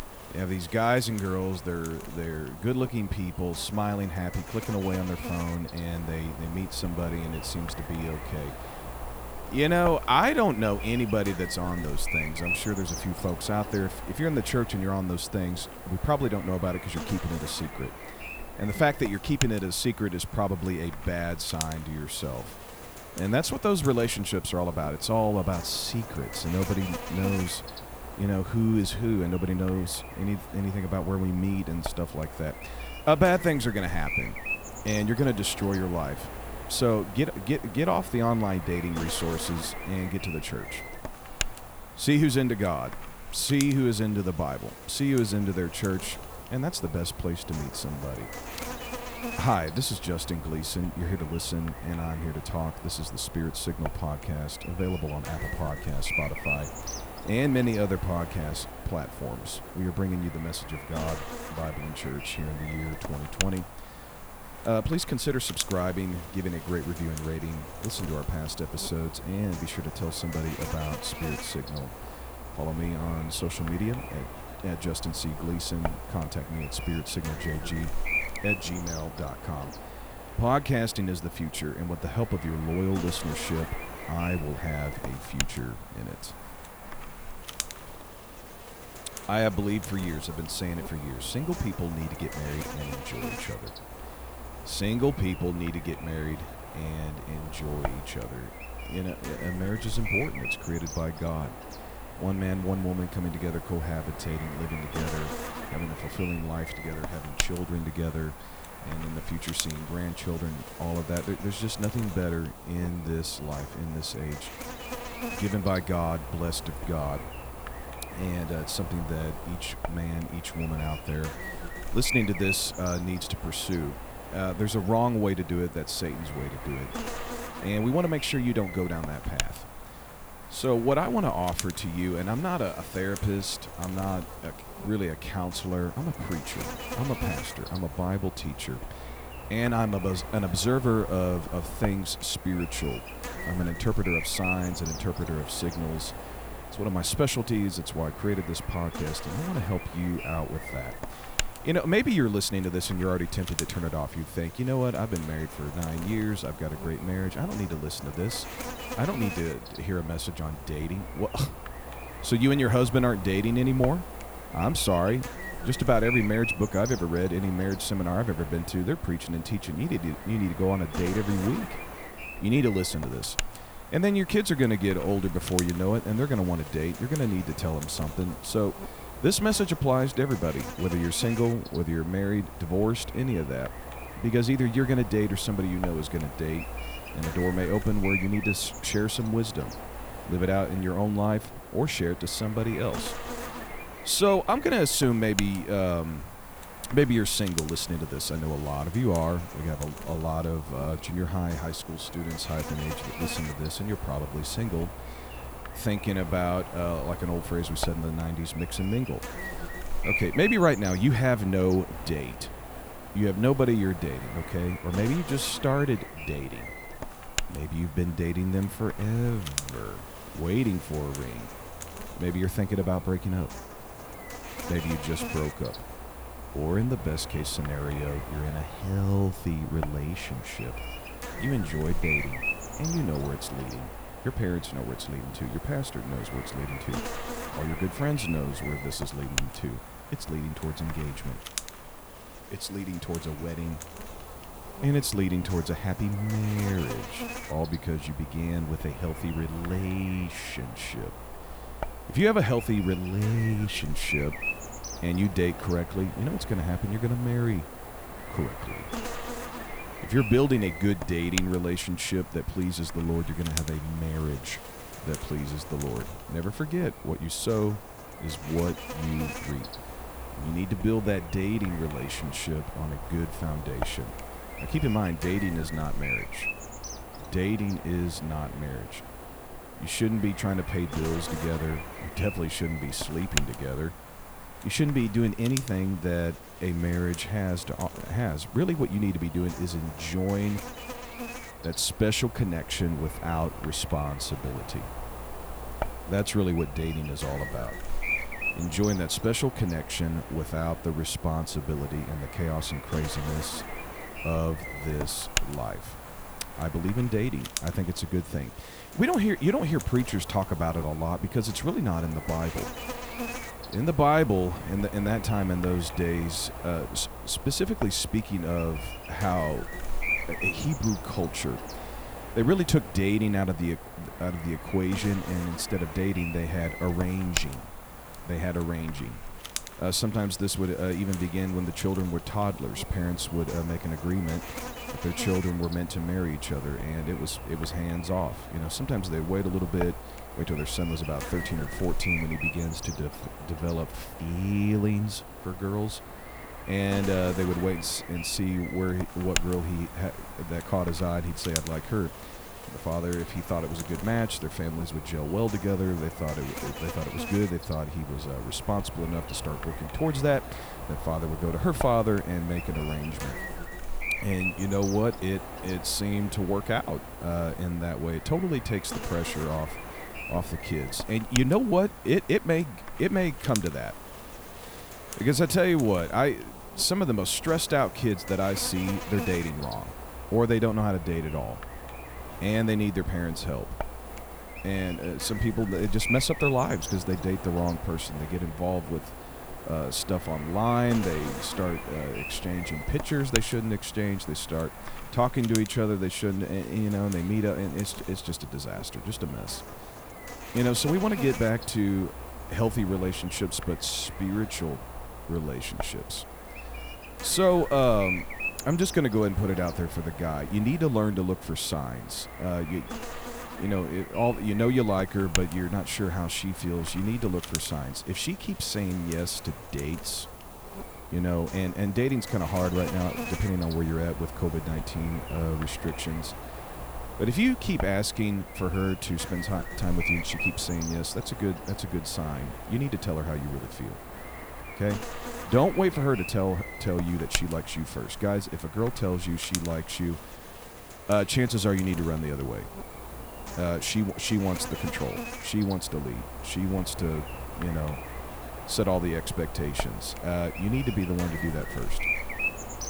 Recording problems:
electrical hum; loud; throughout; 50 Hz, 6 dB below the speech

